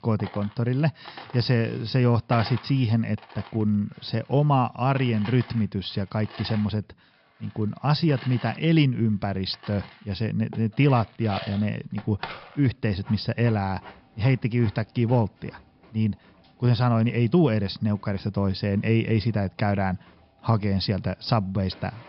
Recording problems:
high frequencies cut off; noticeable; nothing above 5.5 kHz
household noises; noticeable; throughout; 20 dB below the speech

